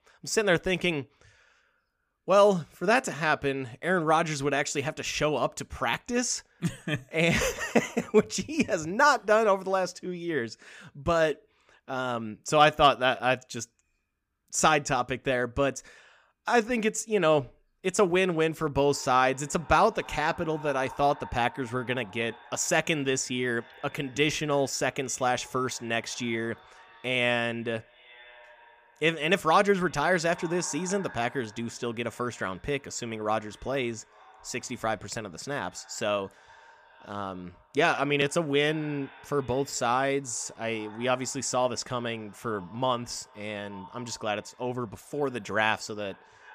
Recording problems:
echo of what is said; faint; from 19 s on; 400 ms later, 25 dB below the speech

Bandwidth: 15 kHz